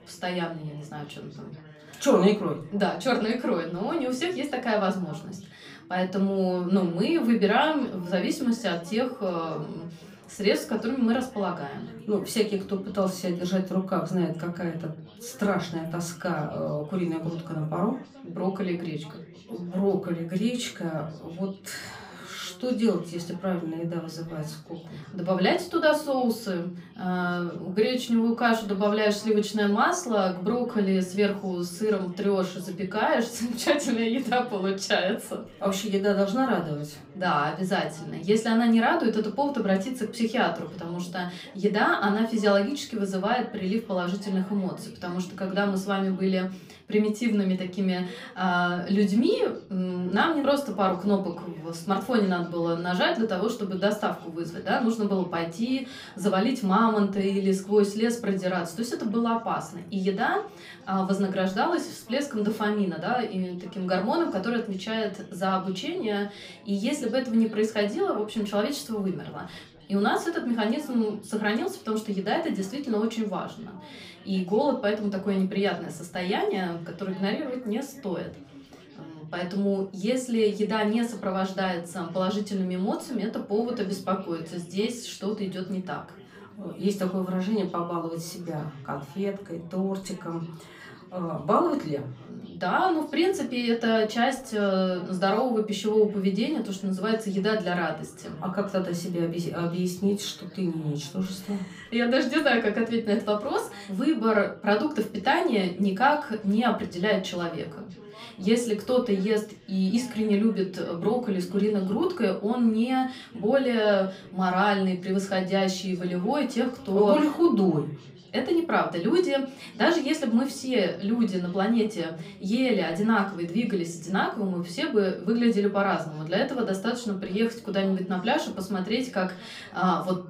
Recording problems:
off-mic speech; far
room echo; very slight; dies away in 0.3 s
background chatter; faint; throughout; 4 voices, 25 dB below the speech

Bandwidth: 15 kHz